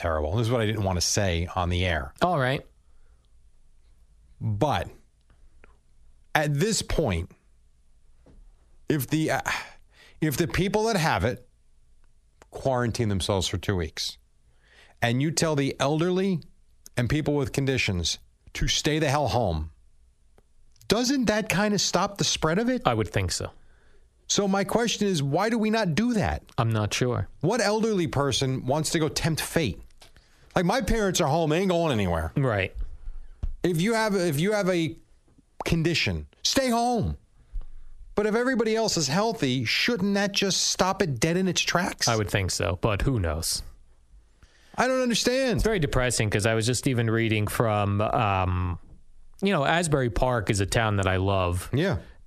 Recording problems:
squashed, flat; heavily

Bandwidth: 14 kHz